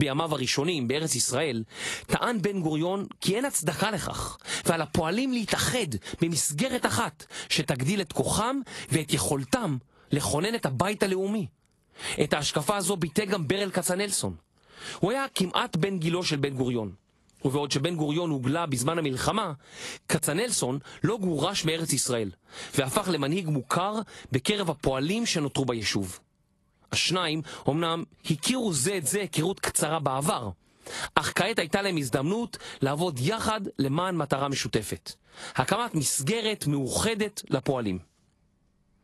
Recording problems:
garbled, watery; slightly; nothing above 11.5 kHz
squashed, flat; somewhat
abrupt cut into speech; at the start

